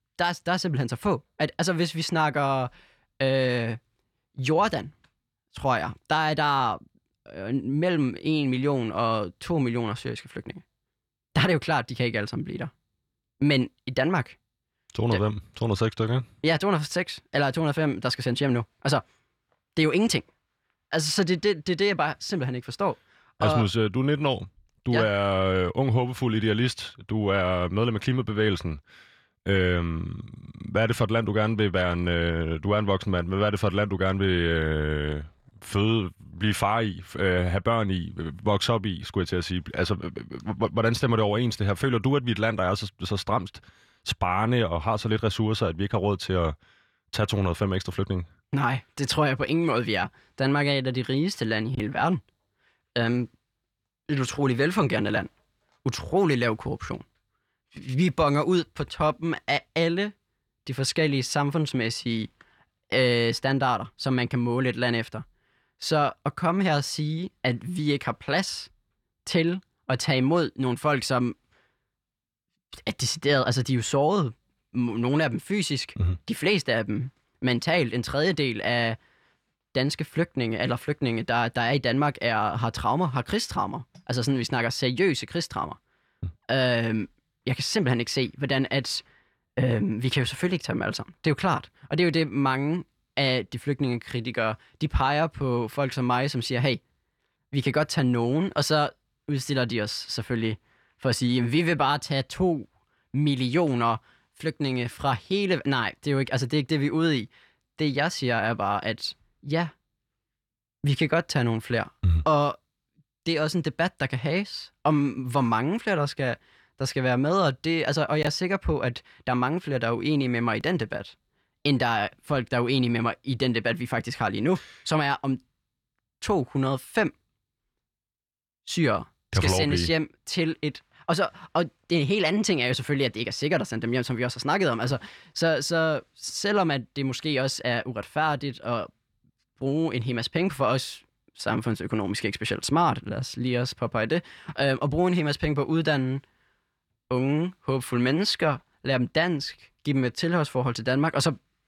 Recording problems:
none

